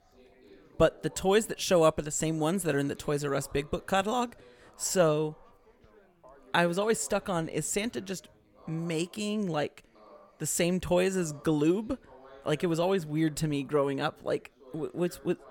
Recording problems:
background chatter; faint; throughout; 4 voices, 25 dB below the speech

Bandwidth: 18 kHz